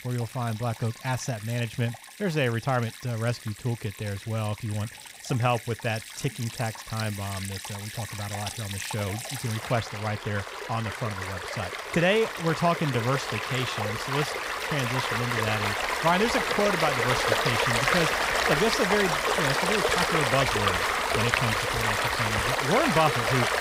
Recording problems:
rain or running water; very loud; throughout; 2 dB above the speech

